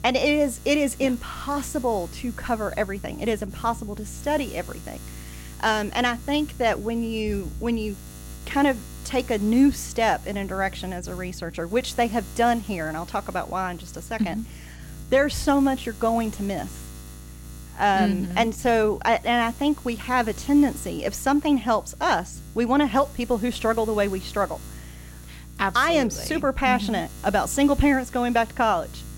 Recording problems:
electrical hum; faint; throughout; 60 Hz, 20 dB below the speech

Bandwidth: 16.5 kHz